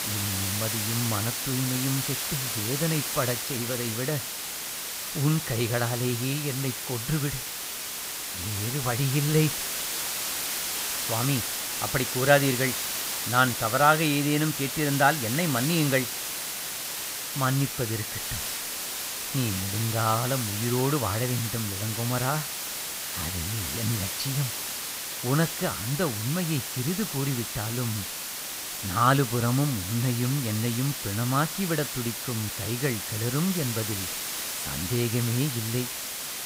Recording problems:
hiss; loud; throughout; 2 dB below the speech

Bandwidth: 15.5 kHz